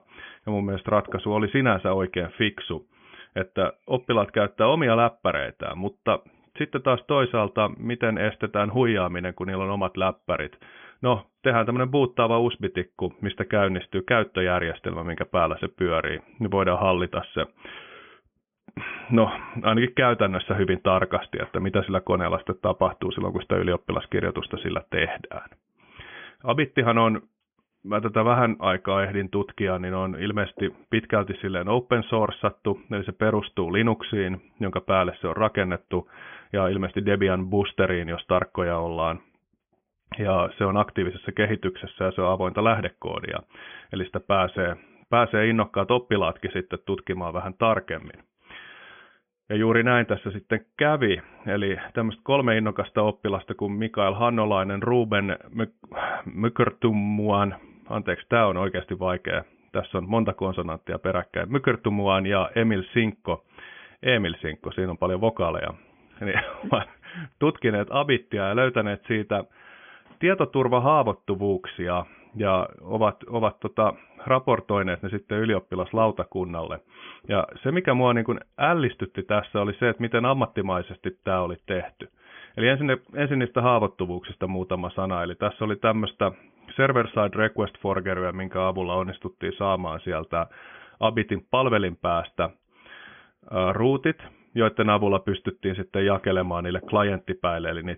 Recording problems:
high frequencies cut off; severe; nothing above 3.5 kHz

